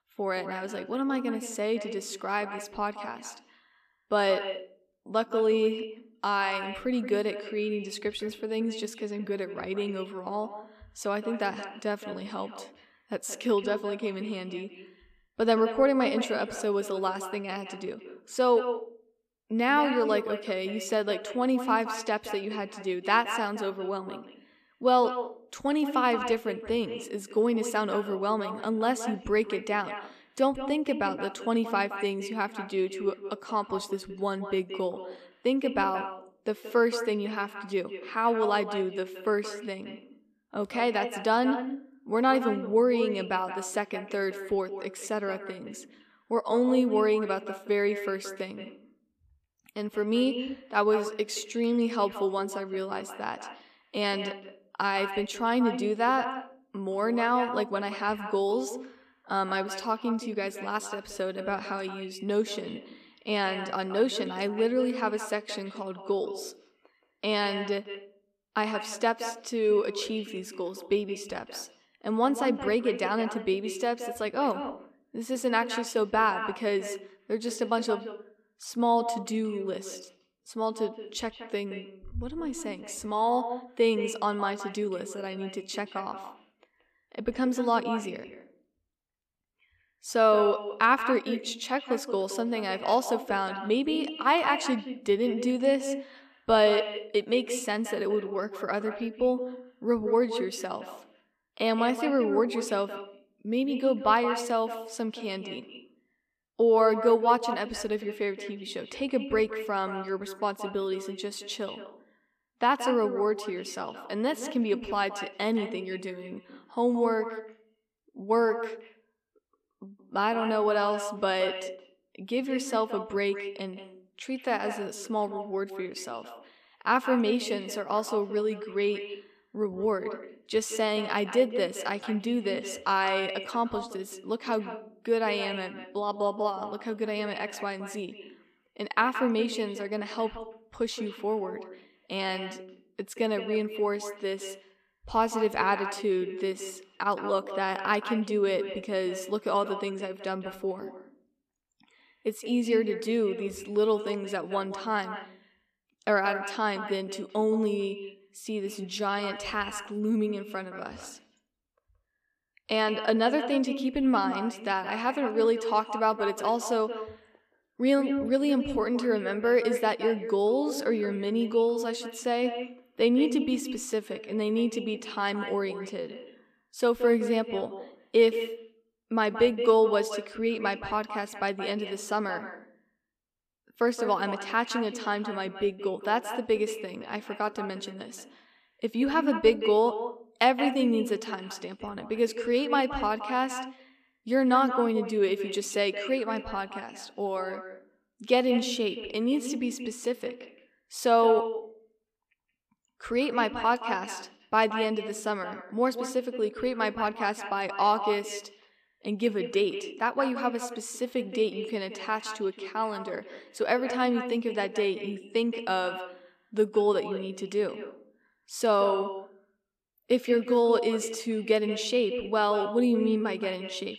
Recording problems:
echo of what is said; strong; throughout; 170 ms later, 9 dB below the speech

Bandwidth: 14.5 kHz